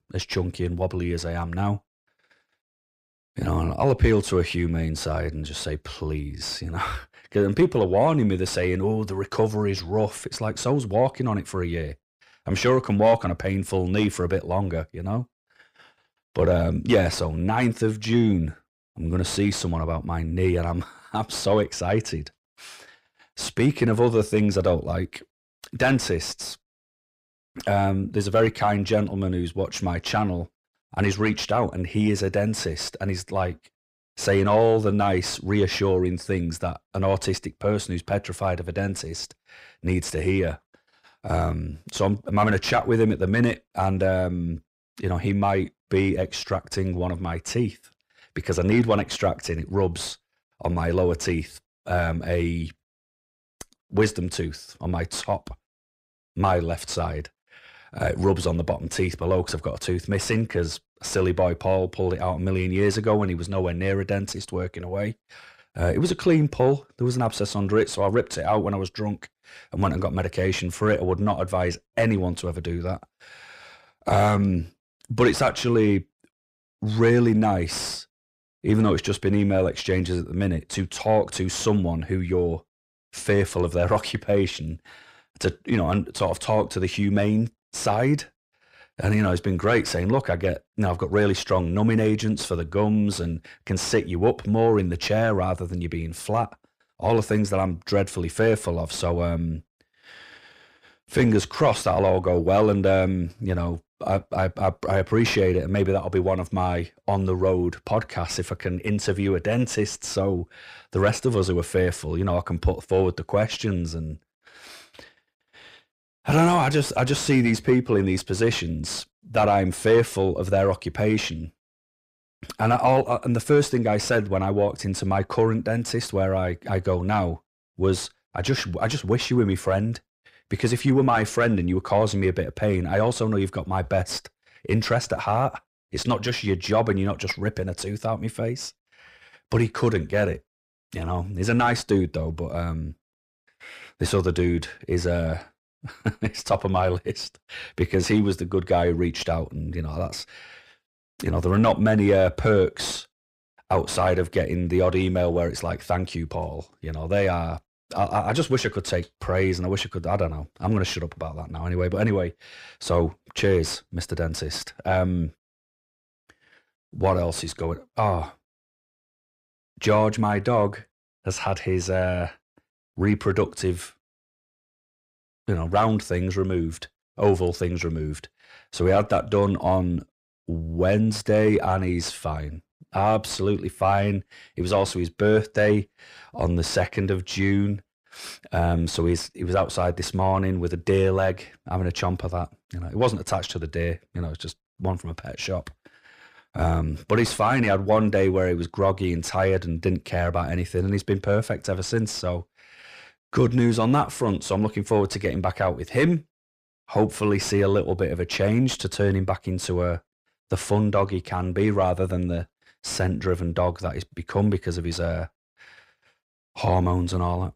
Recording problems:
distortion; slight; 10 dB below the speech

